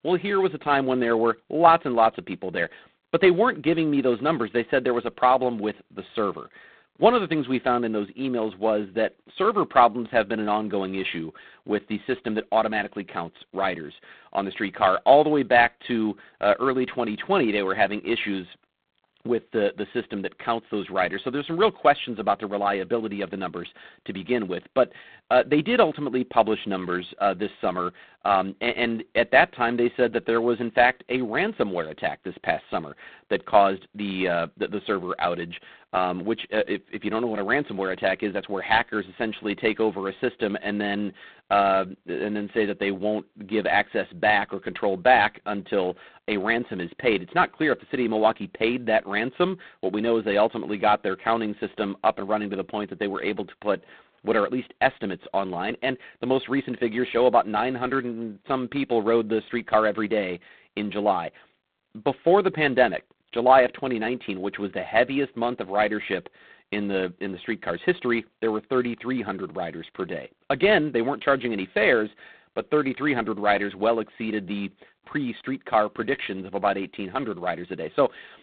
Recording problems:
phone-call audio; poor line; nothing above 4 kHz

